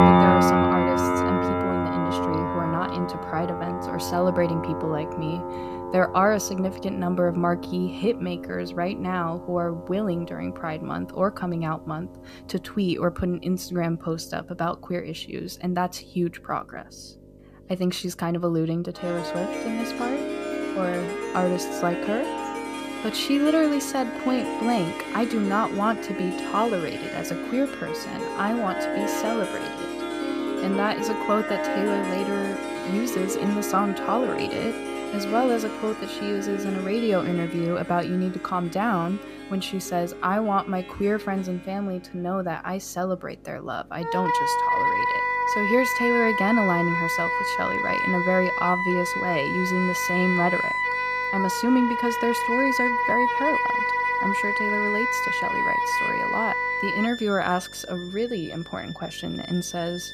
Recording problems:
background music; very loud; throughout; 1 dB above the speech
electrical hum; faint; throughout; 50 Hz, 30 dB below the speech

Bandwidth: 14.5 kHz